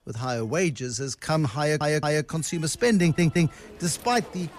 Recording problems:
crowd noise; faint; throughout; 25 dB below the speech
train or aircraft noise; faint; throughout; 25 dB below the speech
audio stuttering; at 1.5 s and at 3 s

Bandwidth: 14.5 kHz